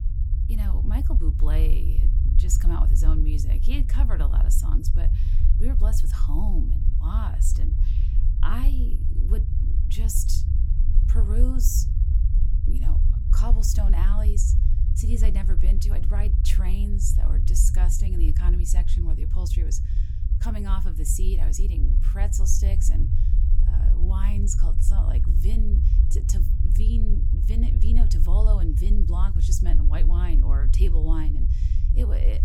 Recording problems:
low rumble; loud; throughout; 5 dB below the speech

